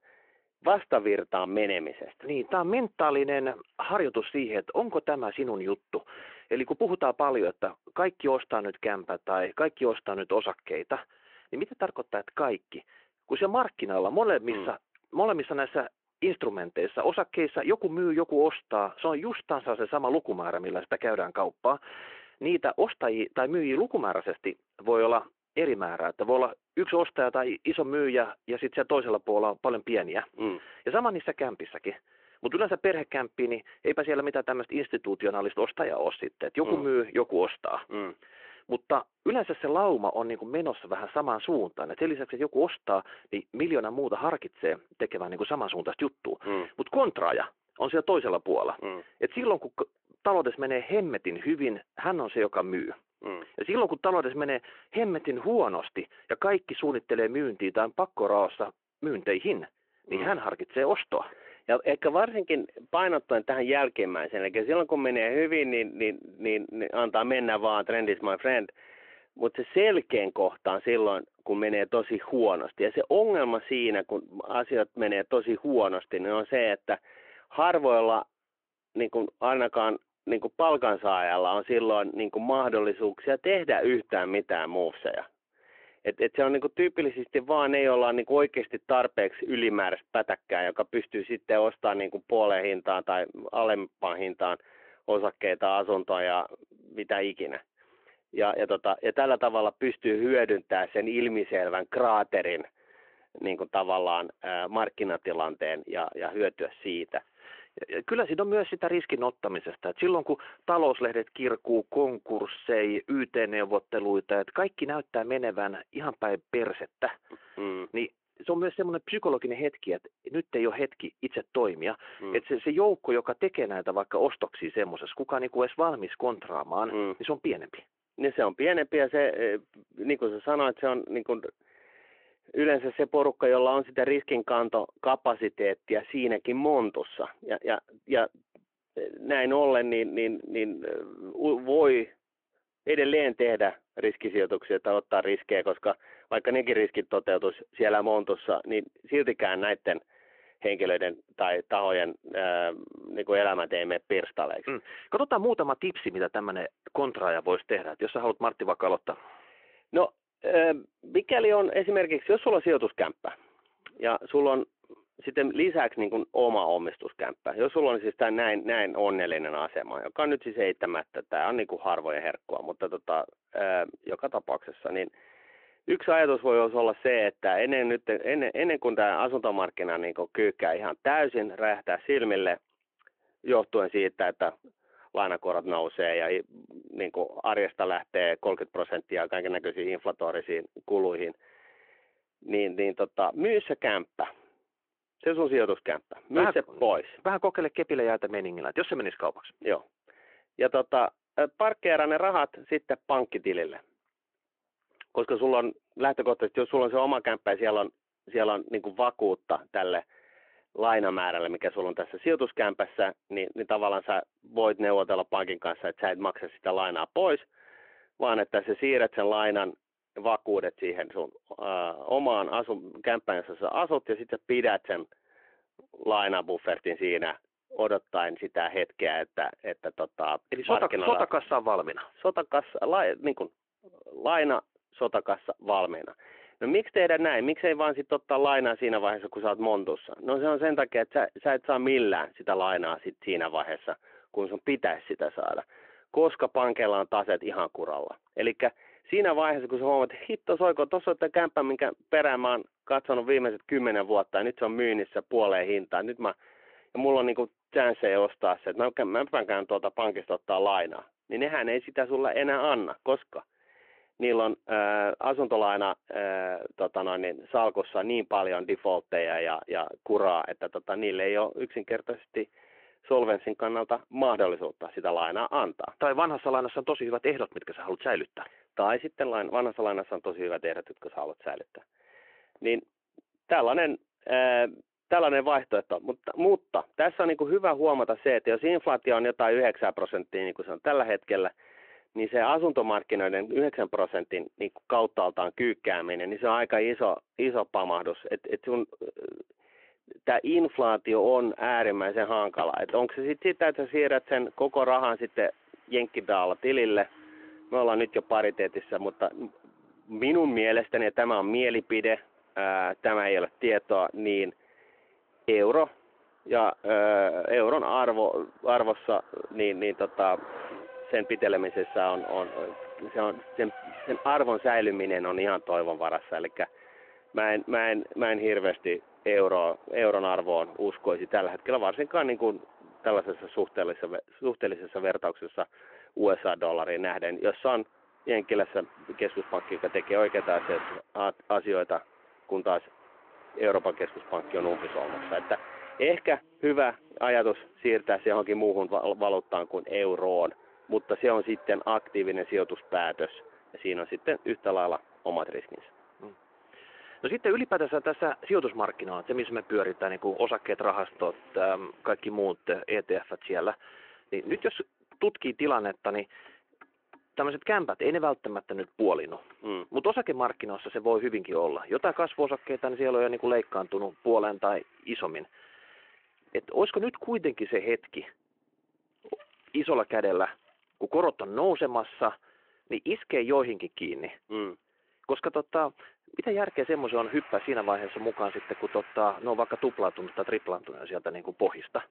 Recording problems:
phone-call audio
traffic noise; faint; from 5:01 on; 20 dB below the speech

